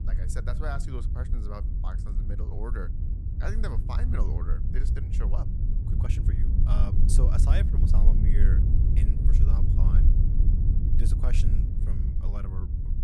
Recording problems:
low rumble; loud; throughout; 1 dB below the speech

